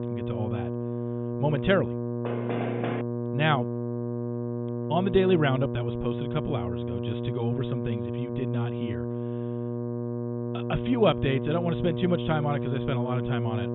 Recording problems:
high frequencies cut off; severe; nothing above 3.5 kHz
electrical hum; loud; throughout; 60 Hz, 6 dB below the speech
door banging; noticeable; at 2.5 s; peak 4 dB below the speech

